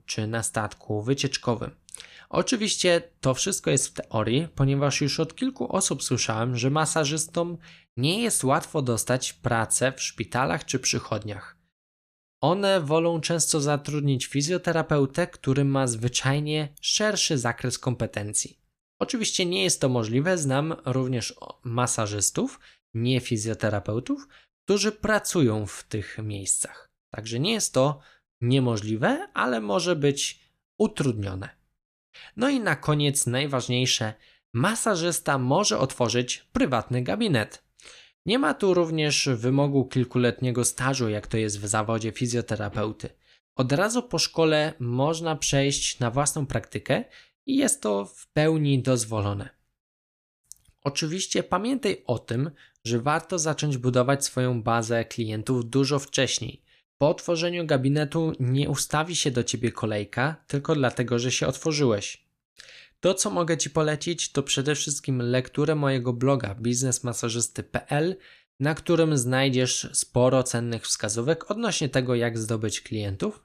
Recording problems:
none

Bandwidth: 14.5 kHz